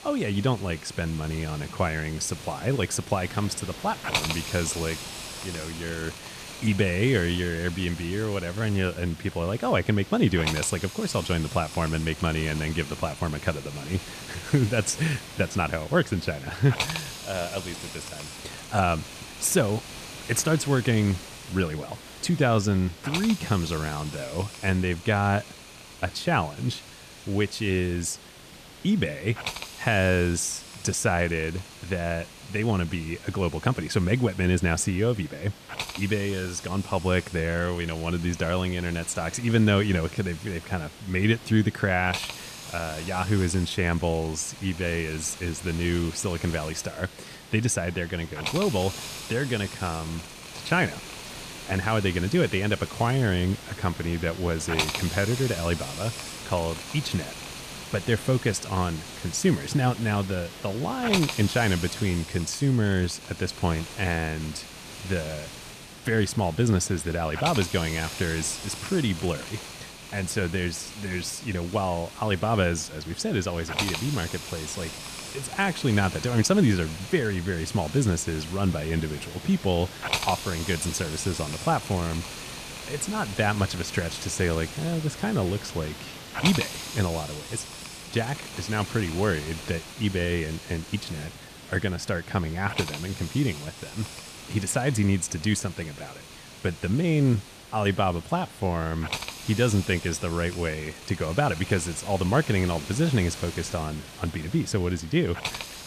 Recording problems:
hiss; loud; throughout; 10 dB below the speech

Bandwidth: 14.5 kHz